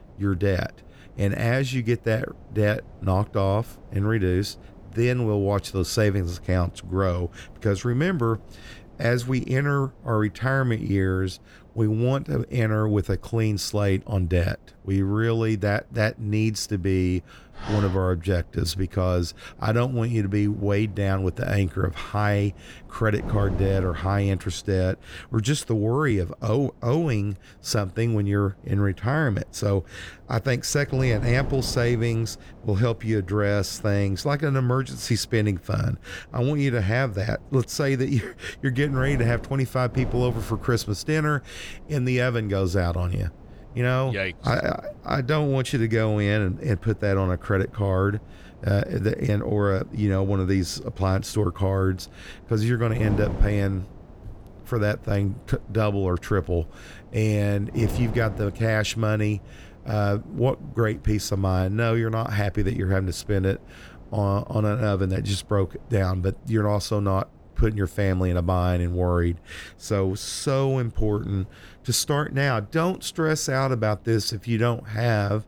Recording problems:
wind noise on the microphone; occasional gusts; 20 dB below the speech
dog barking; noticeable; at 18 s; peak 9 dB below the speech

